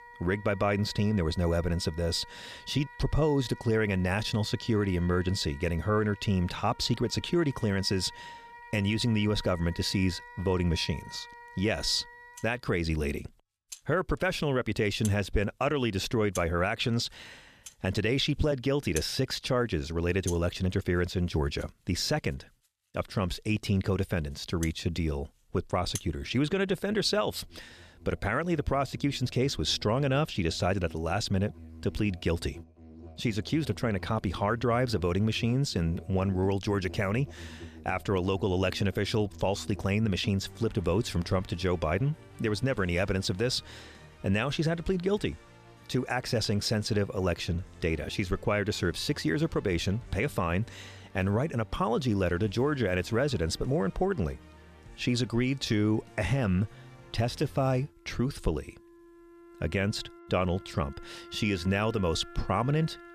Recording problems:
background music; noticeable; throughout; 20 dB below the speech

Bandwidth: 14 kHz